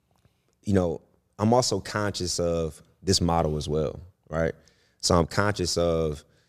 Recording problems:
none

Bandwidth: 14.5 kHz